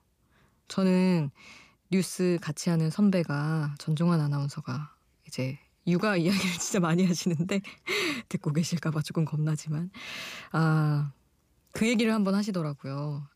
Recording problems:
none

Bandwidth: 15 kHz